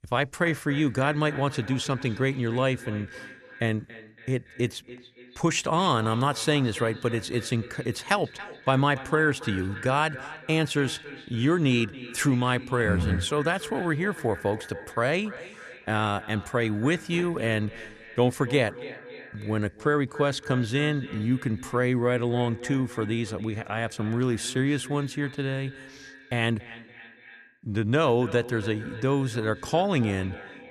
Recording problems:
echo of what is said; noticeable; throughout; 280 ms later, 15 dB below the speech

